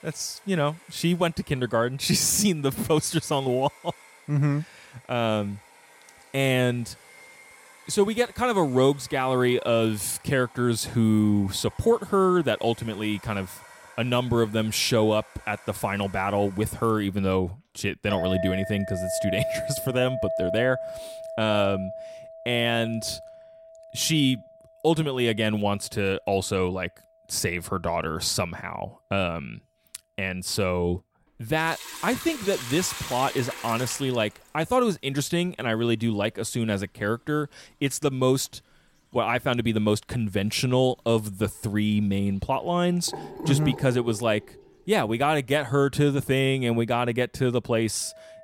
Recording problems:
household noises; noticeable; throughout; 10 dB below the speech

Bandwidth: 16 kHz